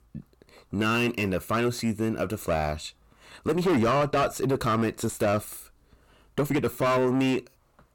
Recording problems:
distortion; heavy; 6 dB below the speech
uneven, jittery; strongly; from 0.5 to 7 s

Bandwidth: 17.5 kHz